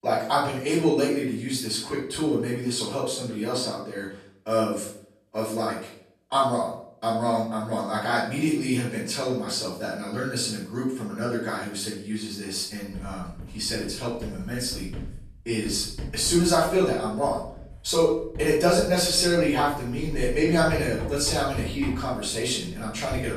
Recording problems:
off-mic speech; far
room echo; noticeable; dies away in 0.5 s
household noises; noticeable; from 13 s on; 15 dB below the speech

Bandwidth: 14 kHz